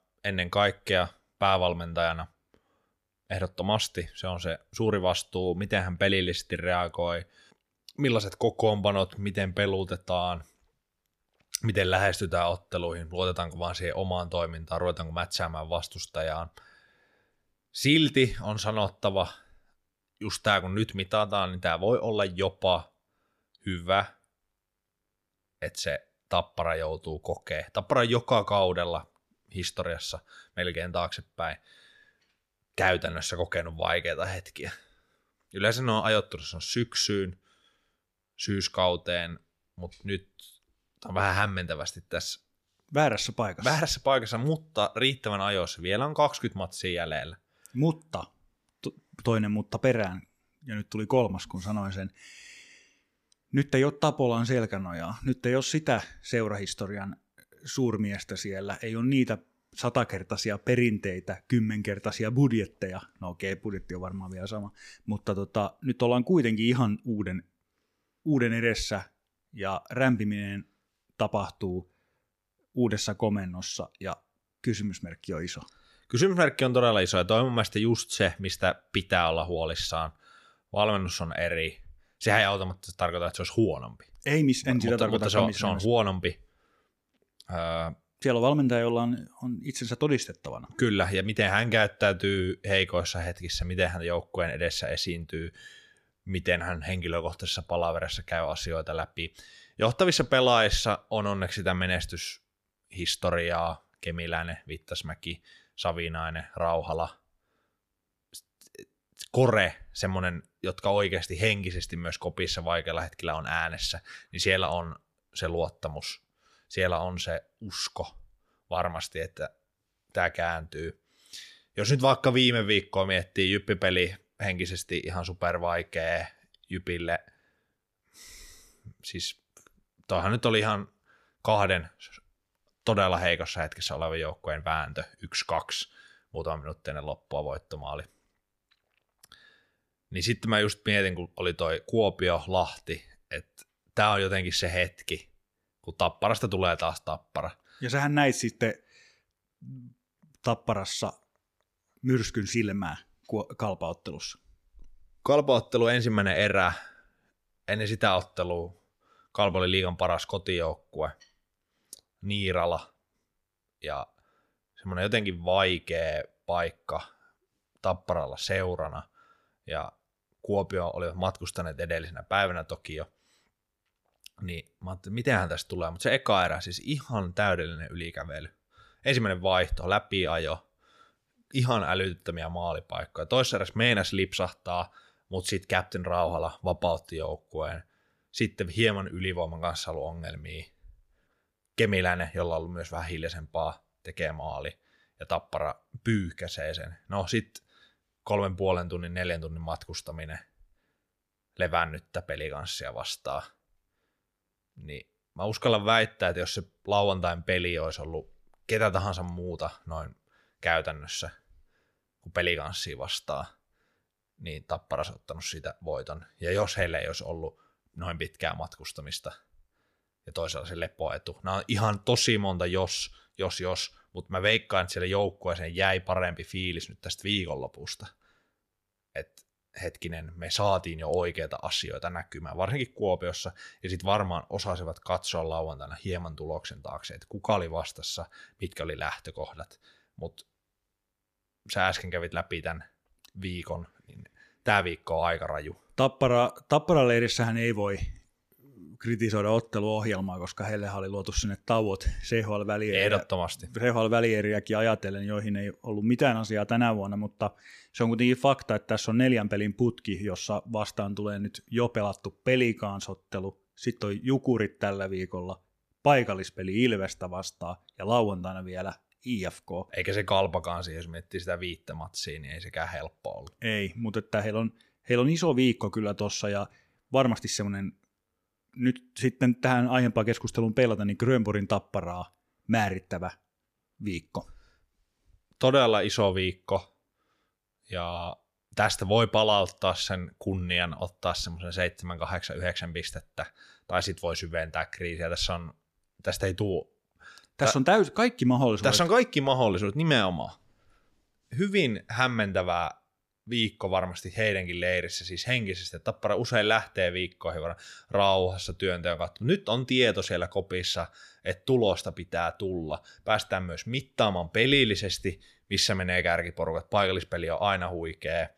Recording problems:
none

